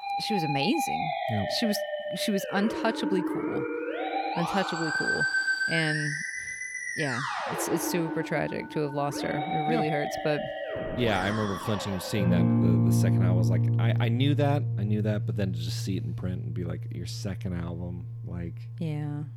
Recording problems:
background music; very loud; throughout; 2 dB above the speech

